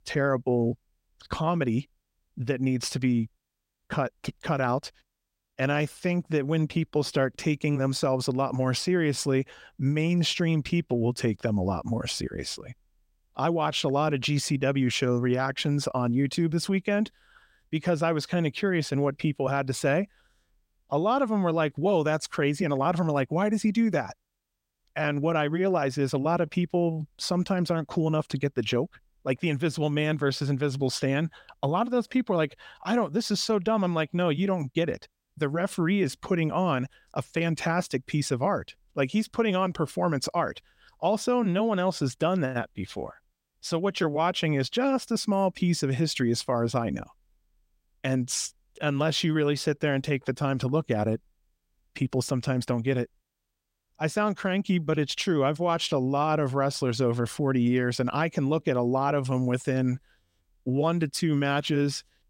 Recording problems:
none

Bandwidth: 16 kHz